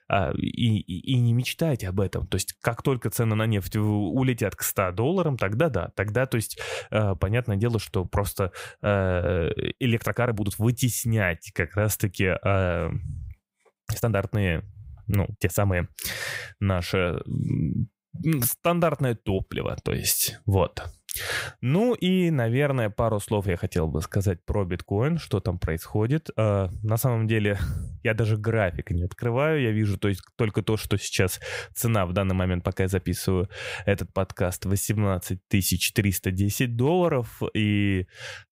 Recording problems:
uneven, jittery; strongly; from 9 to 35 s

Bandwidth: 15.5 kHz